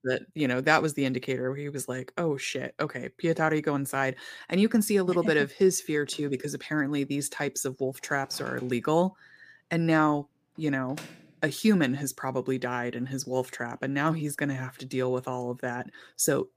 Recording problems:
household noises; faint; from 6.5 s on; 25 dB below the speech

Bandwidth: 15 kHz